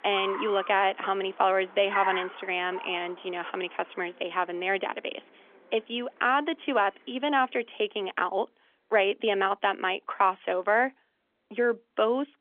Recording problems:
phone-call audio; nothing above 3.5 kHz
traffic noise; noticeable; throughout; 10 dB below the speech

